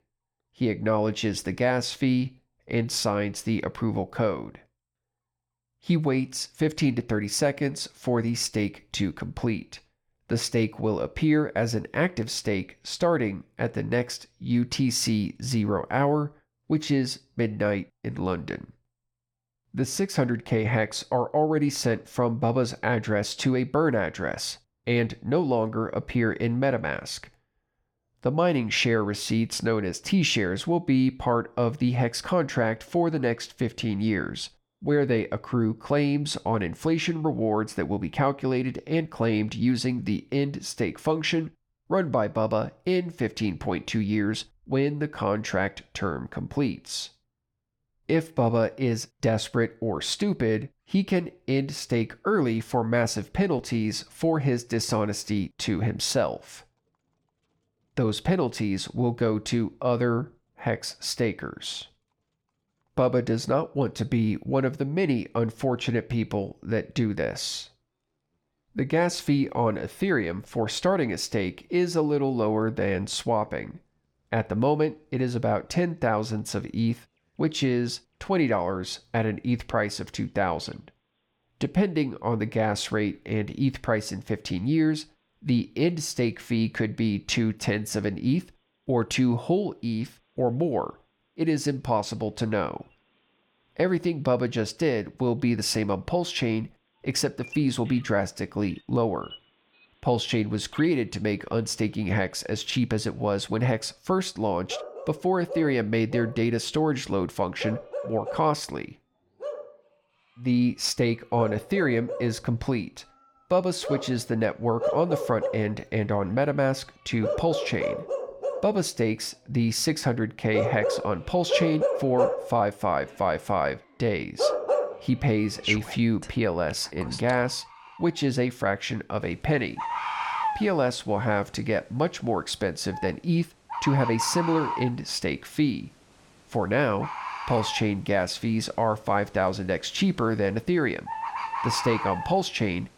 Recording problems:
animal sounds; loud; throughout; 6 dB below the speech

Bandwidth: 17.5 kHz